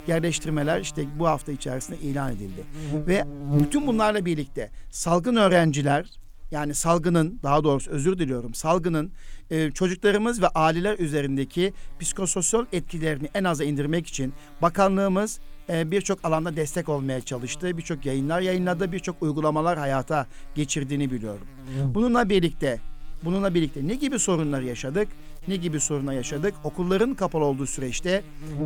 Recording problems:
electrical hum; noticeable; throughout; 60 Hz, 15 dB below the speech

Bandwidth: 18.5 kHz